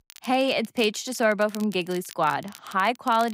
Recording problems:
crackle, like an old record; faint; 20 dB below the speech
abrupt cut into speech; at the end

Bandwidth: 15.5 kHz